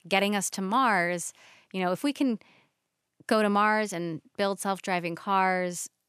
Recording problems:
none

